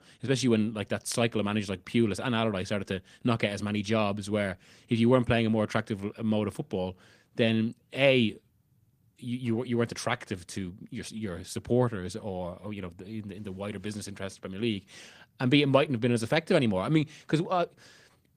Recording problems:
garbled, watery; slightly

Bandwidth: 15 kHz